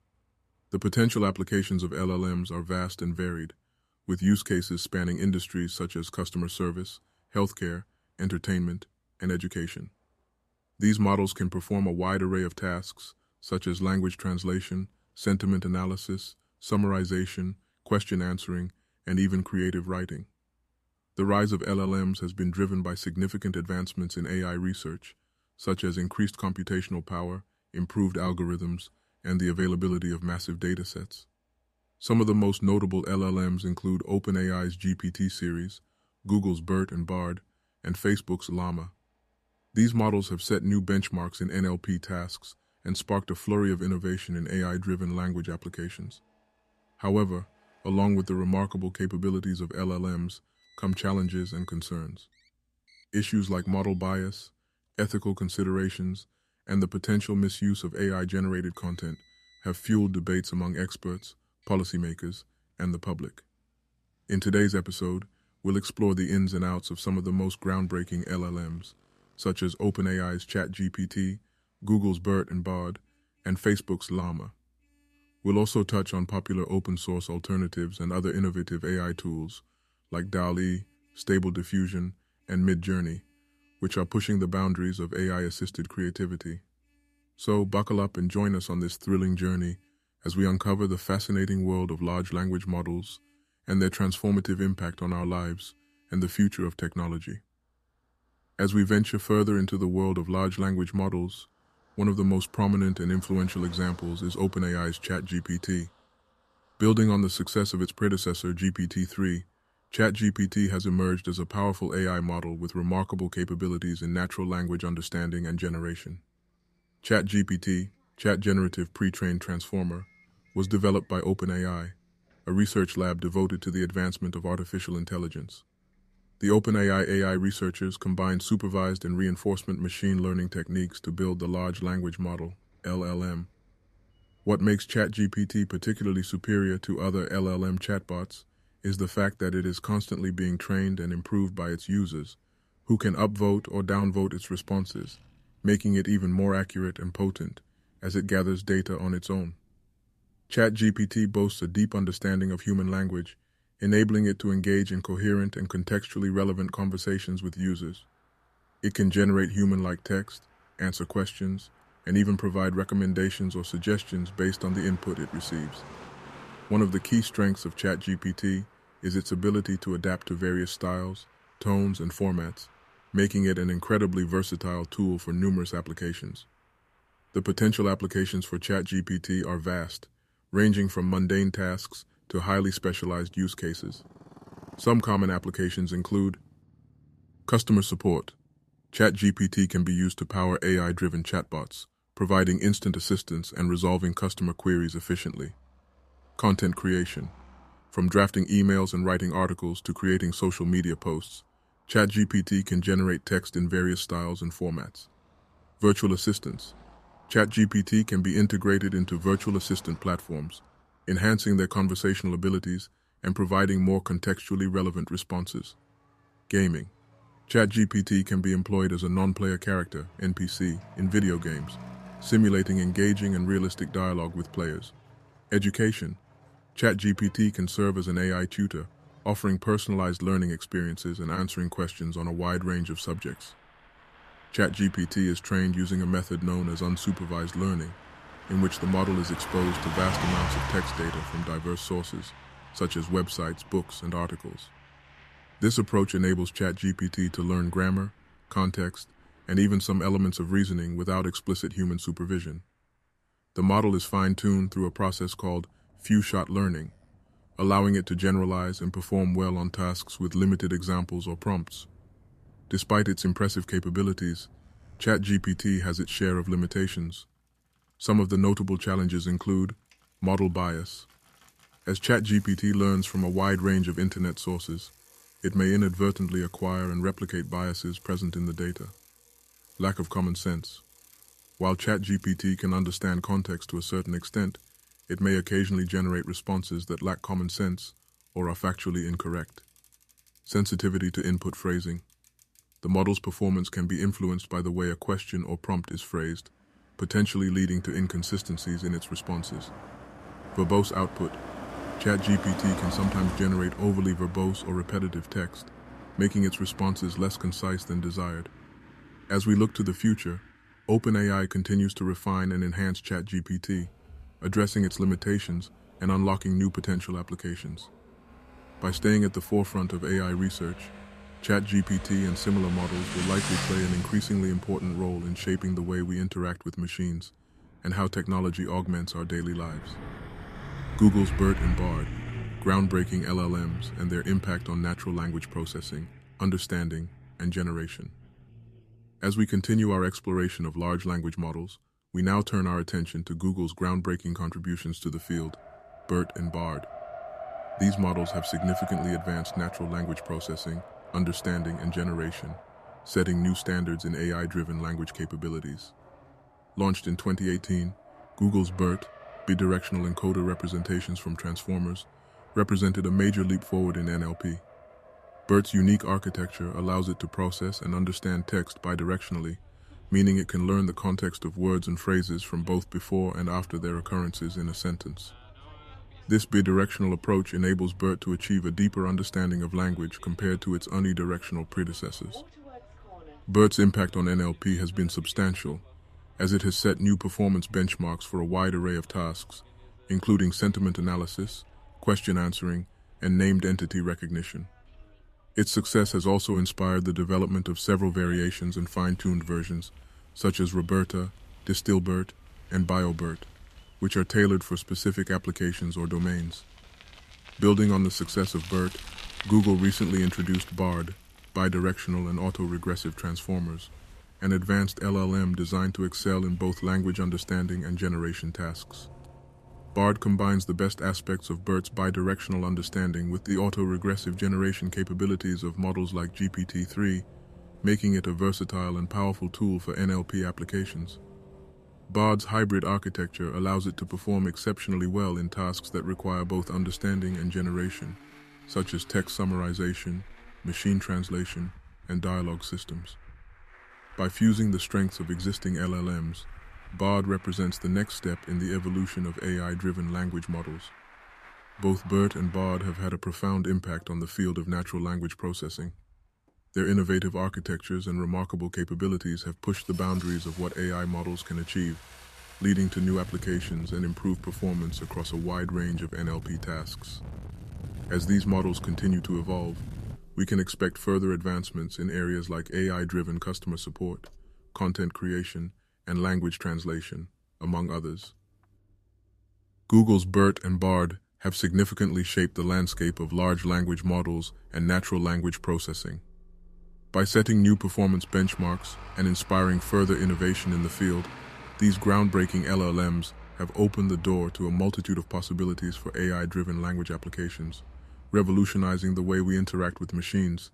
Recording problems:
traffic noise; noticeable; throughout; 15 dB below the speech

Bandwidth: 14.5 kHz